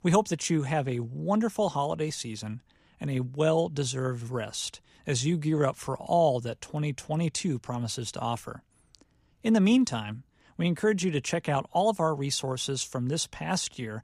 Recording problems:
none

